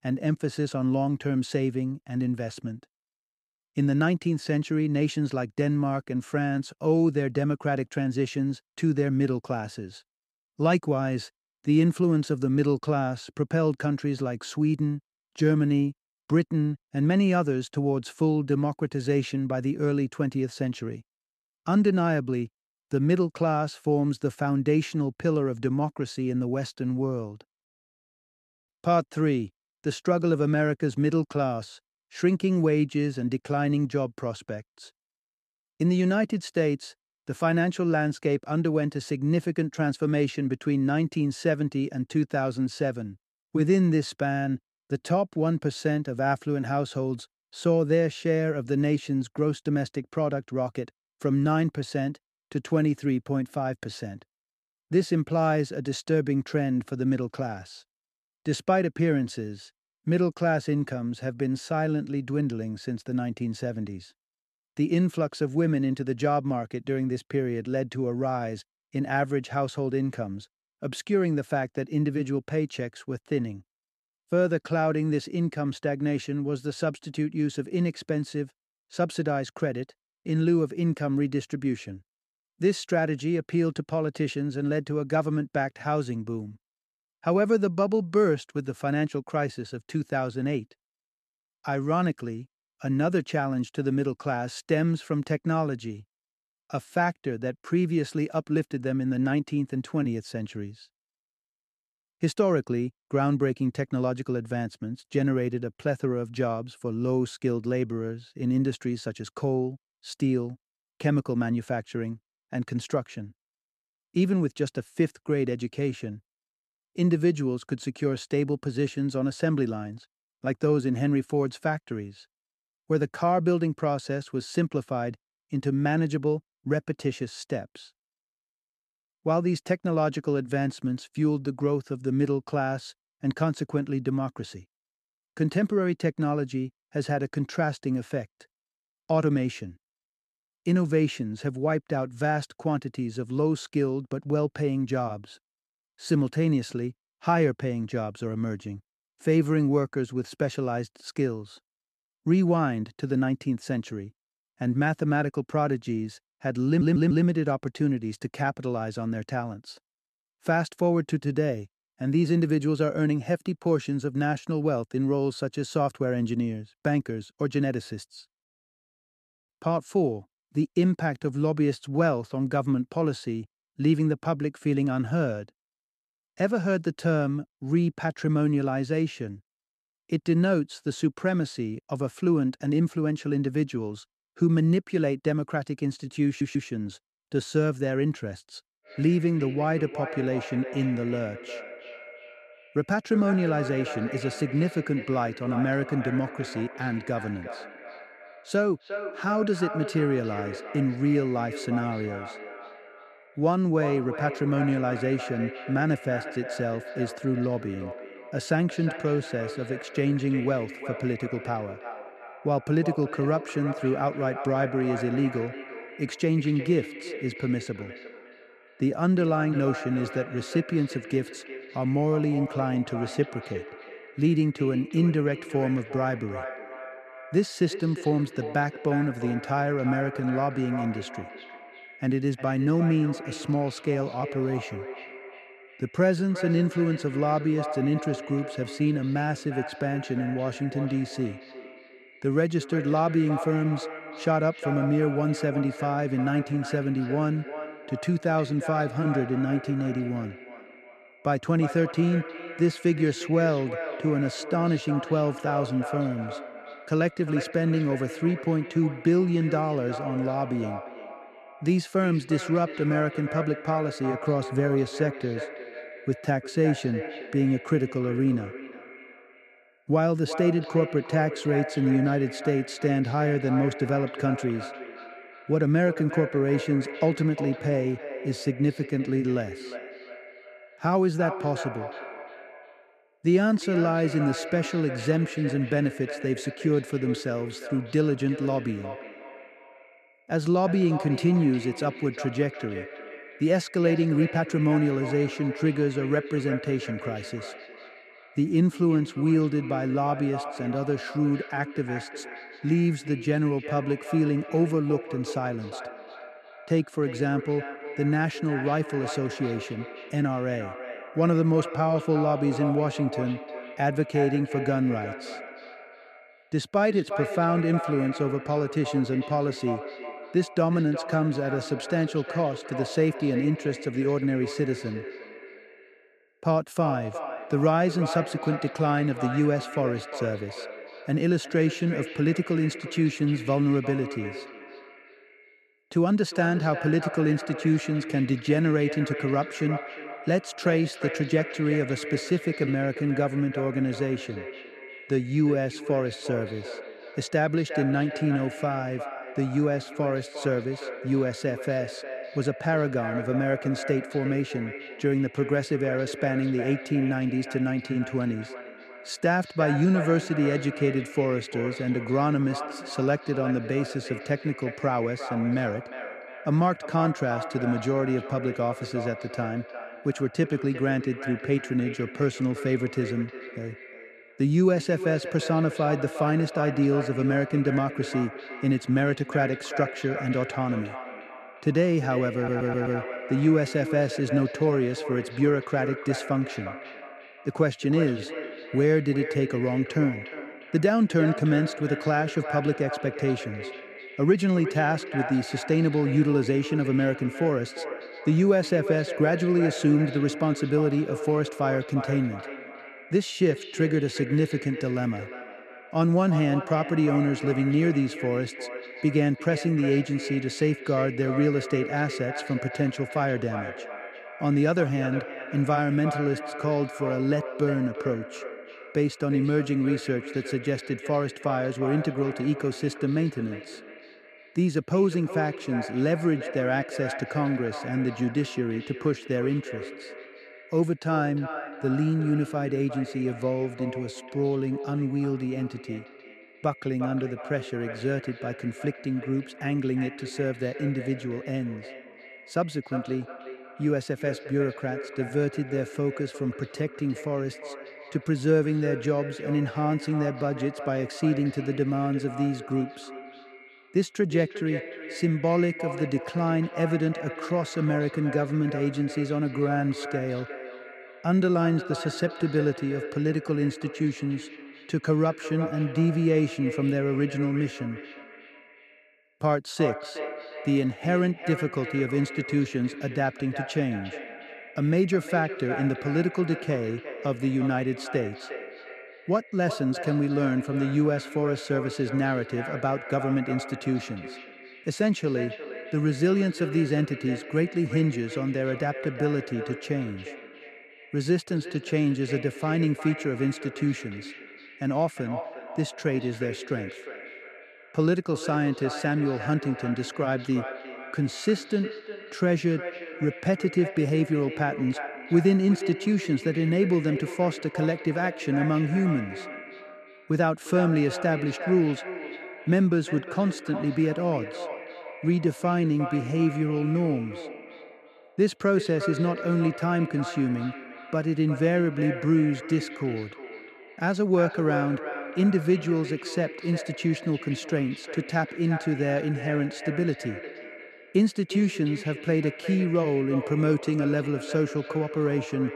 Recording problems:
echo of what is said; strong; from 3:09 on; 360 ms later, 10 dB below the speech
audio stuttering; at 2:37, at 3:06 and at 6:22

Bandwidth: 13.5 kHz